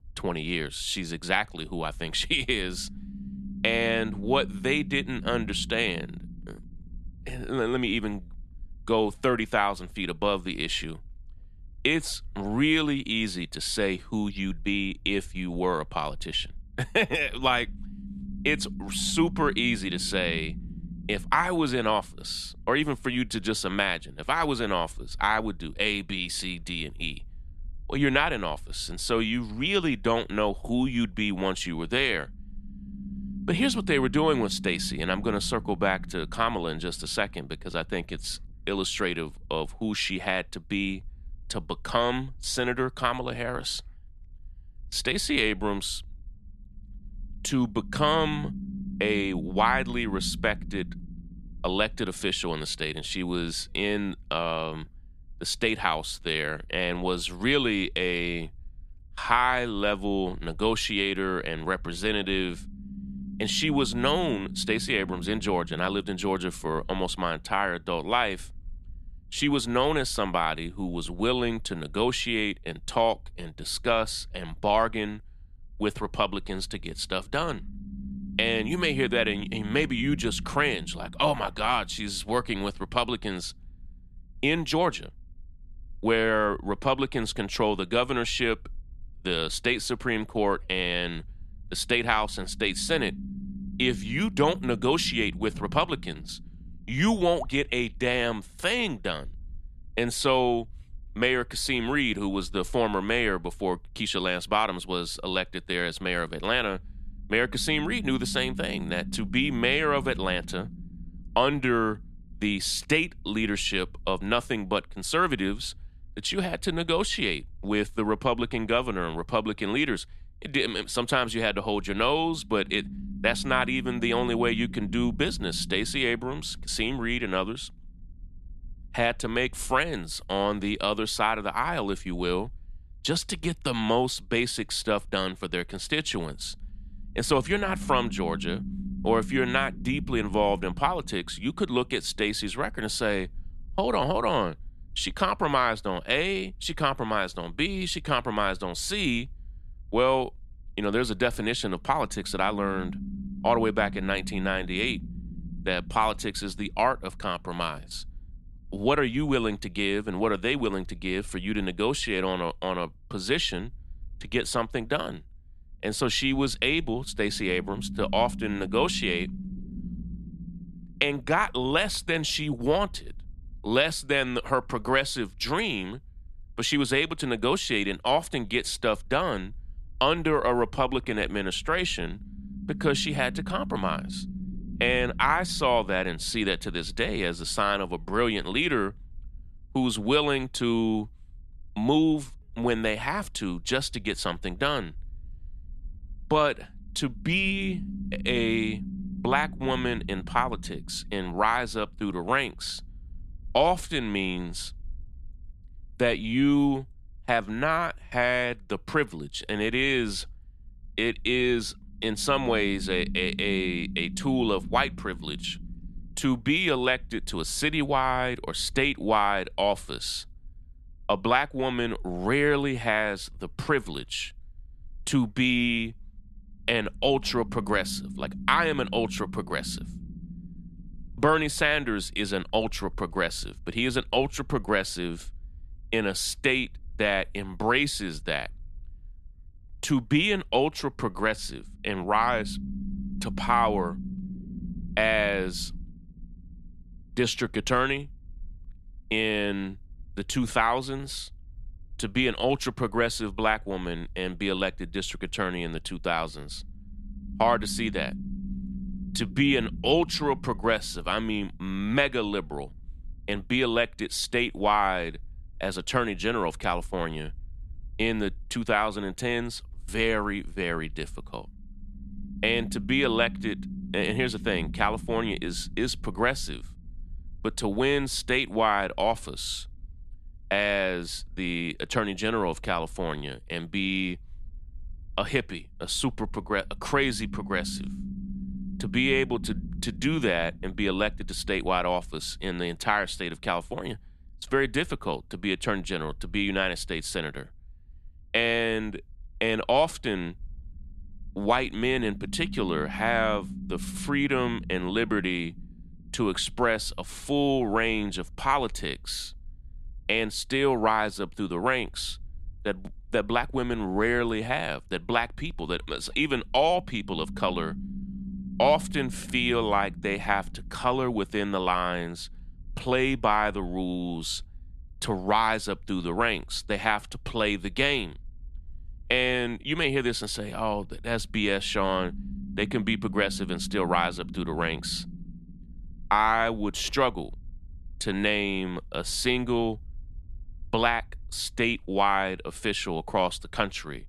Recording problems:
low rumble; faint; throughout; 20 dB below the speech

